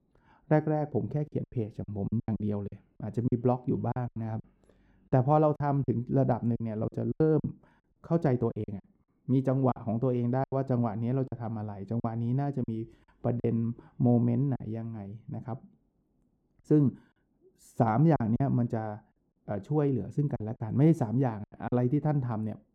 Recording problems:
muffled; very; fading above 1 kHz
choppy; very; 9% of the speech affected

